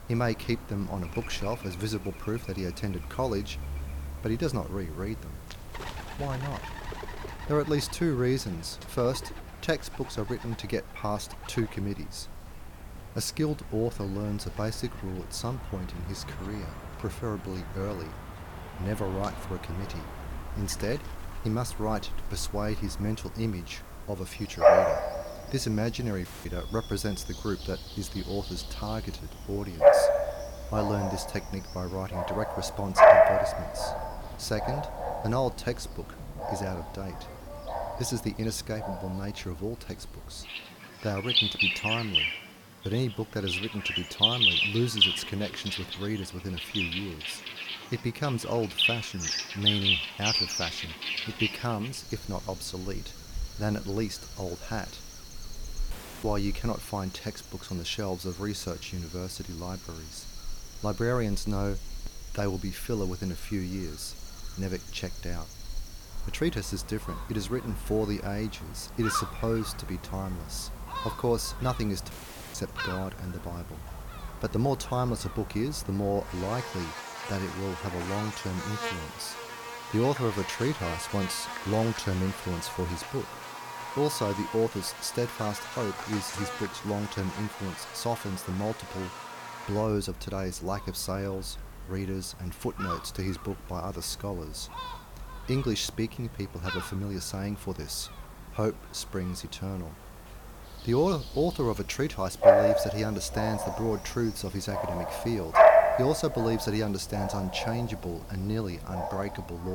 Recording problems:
animal sounds; very loud; throughout; 3 dB above the speech
murmuring crowd; faint; throughout; 25 dB below the speech
hiss; faint; throughout; 20 dB below the speech
audio cutting out; at 26 s, at 56 s and at 1:12
abrupt cut into speech; at the end

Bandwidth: 18 kHz